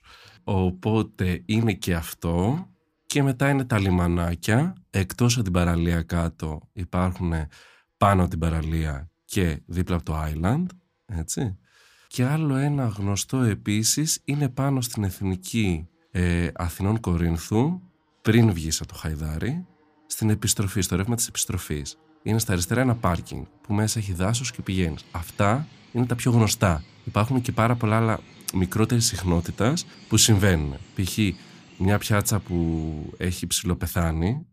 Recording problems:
animal sounds; faint; throughout; 25 dB below the speech

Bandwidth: 15 kHz